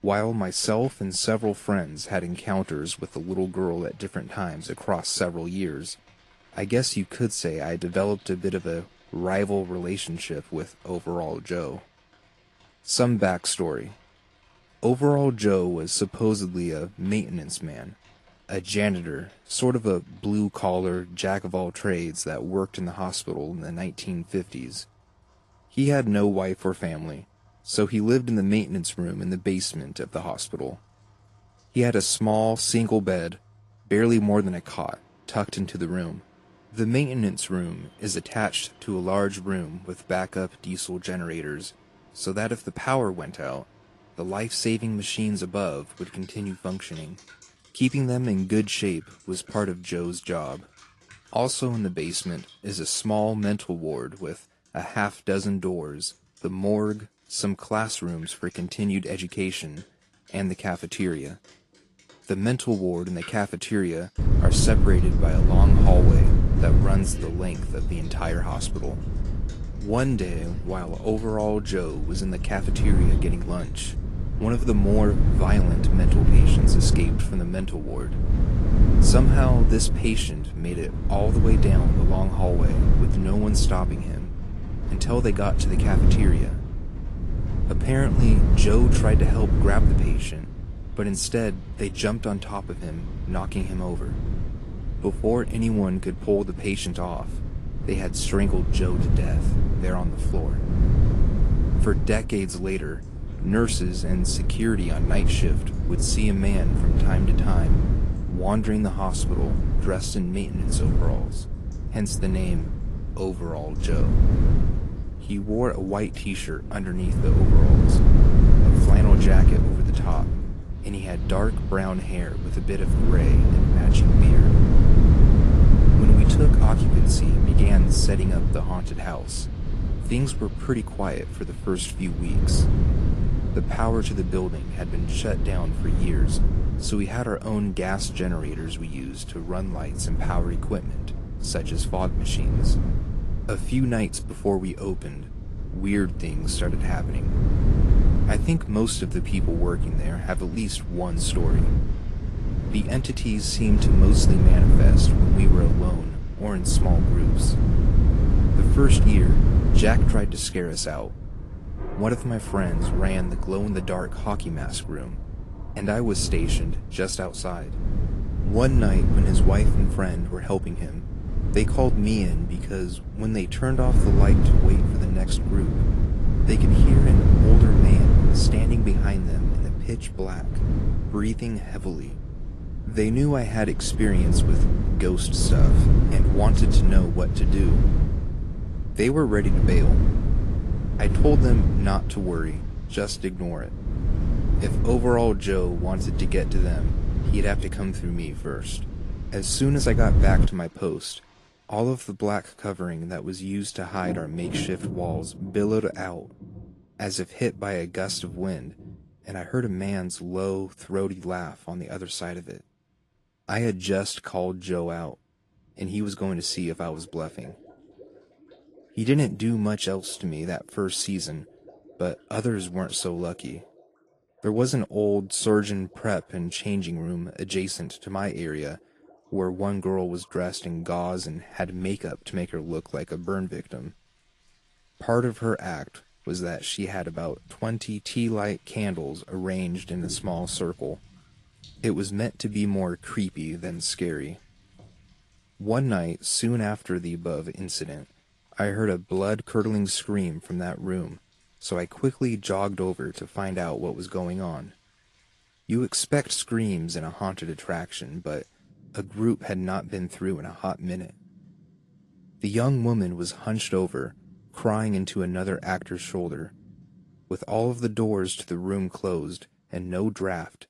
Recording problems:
garbled, watery; slightly
wind noise on the microphone; heavy; from 1:04 to 3:20; 5 dB below the speech
rain or running water; faint; throughout; 25 dB below the speech

